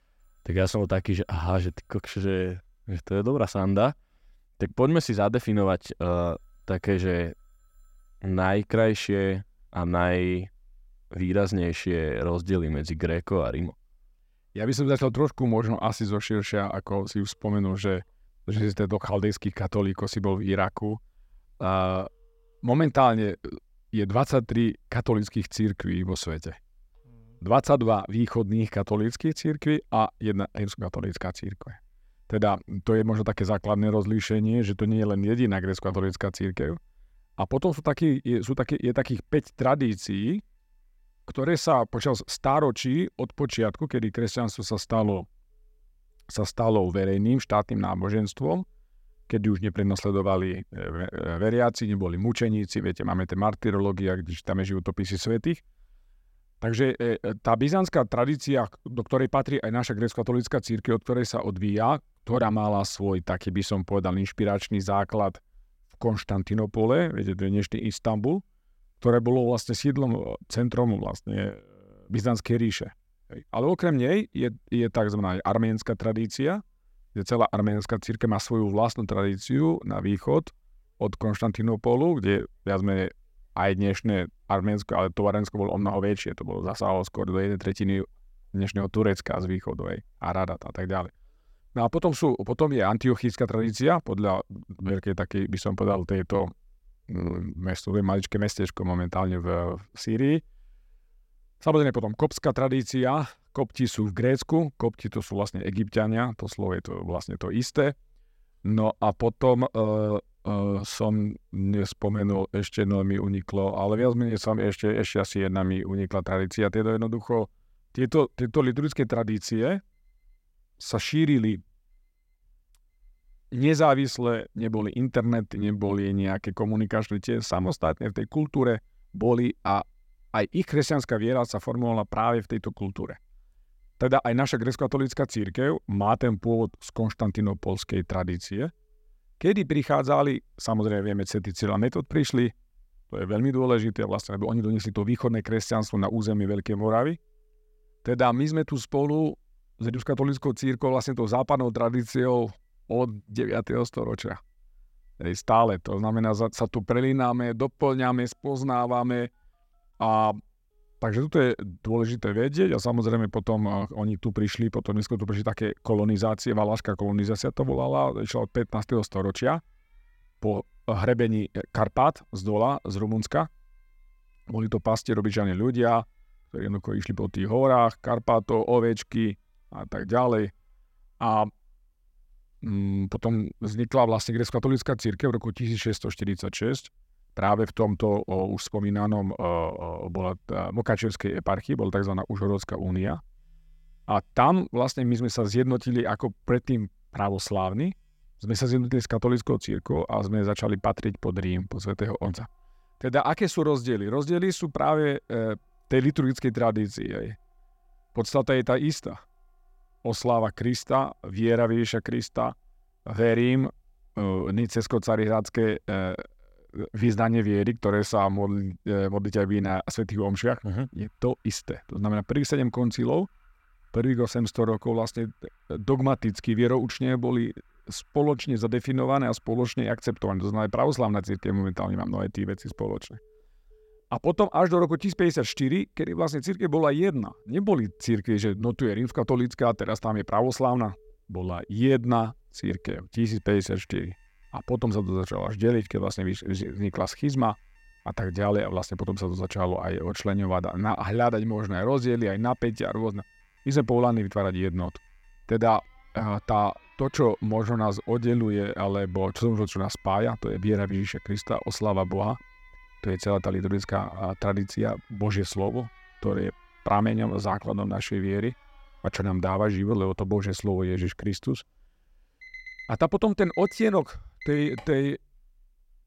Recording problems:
alarms or sirens; faint; throughout; 30 dB below the speech

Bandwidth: 16 kHz